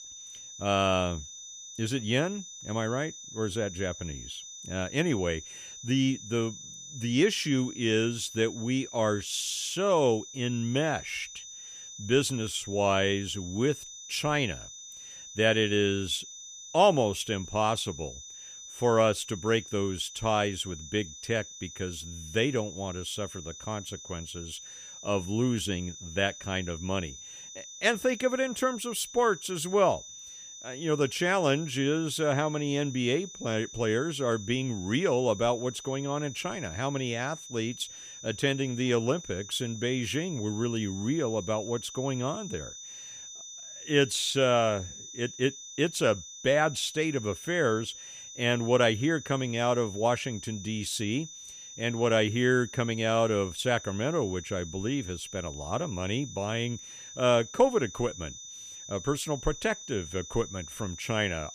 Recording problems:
high-pitched whine; noticeable; throughout; 6 kHz, 15 dB below the speech

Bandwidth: 15 kHz